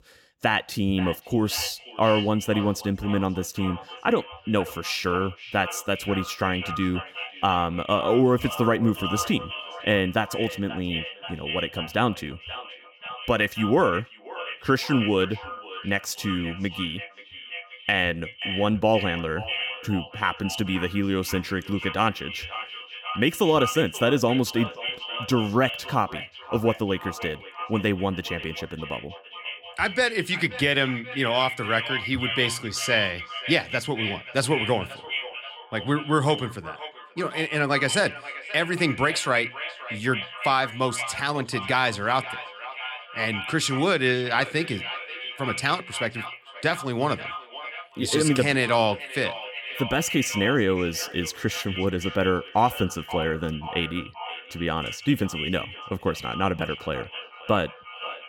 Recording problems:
echo of what is said; strong; throughout; 530 ms later, 9 dB below the speech

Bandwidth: 17 kHz